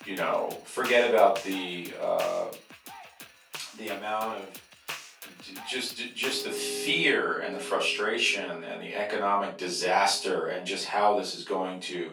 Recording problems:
off-mic speech; far
thin; very; fading below 700 Hz
room echo; slight; dies away in 0.3 s
background music; noticeable; throughout; 15 dB below the speech

